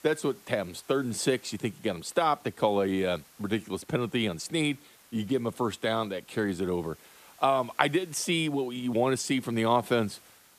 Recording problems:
hiss; faint; throughout; 25 dB below the speech

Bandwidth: 14.5 kHz